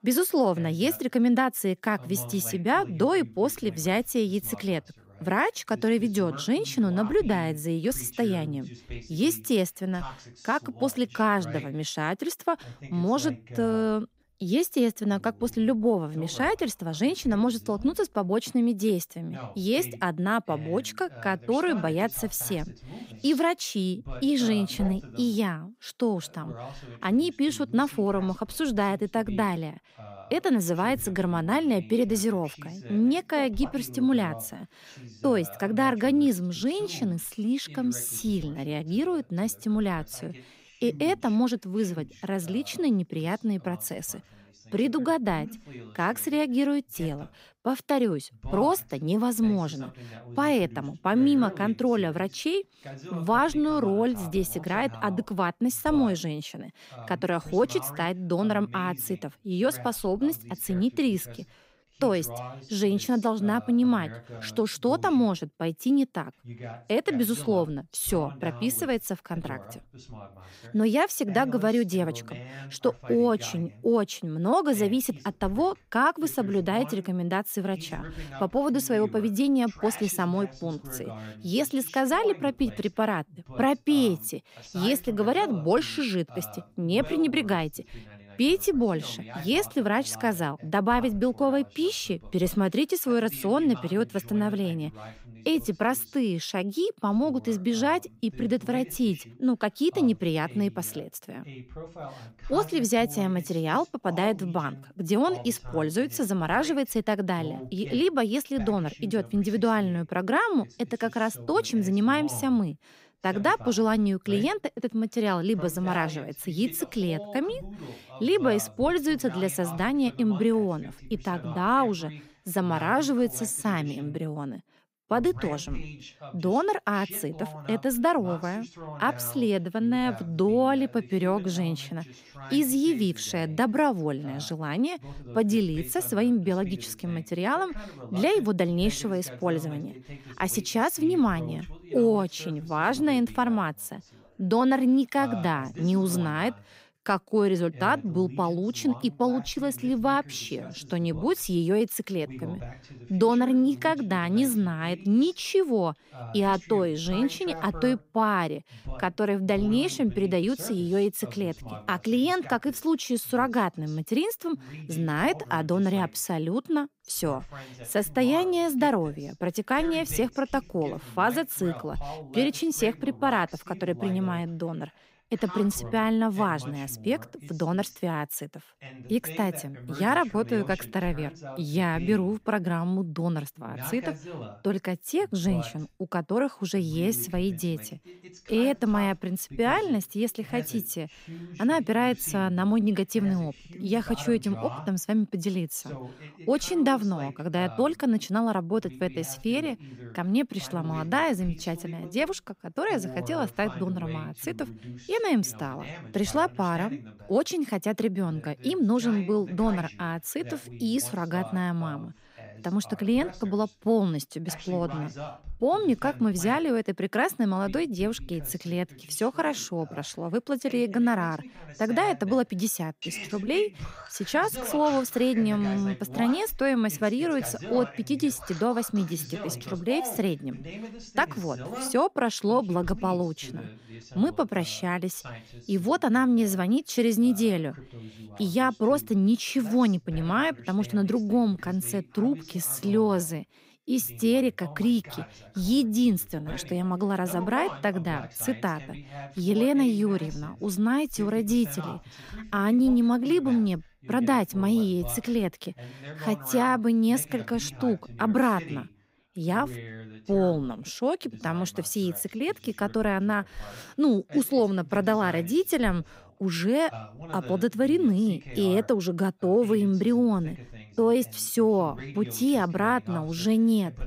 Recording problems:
voice in the background; noticeable; throughout; 15 dB below the speech

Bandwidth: 15.5 kHz